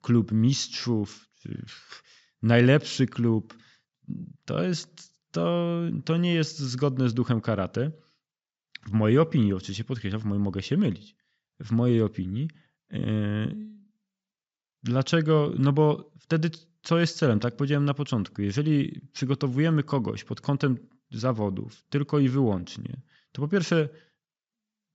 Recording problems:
high frequencies cut off; noticeable; nothing above 7.5 kHz

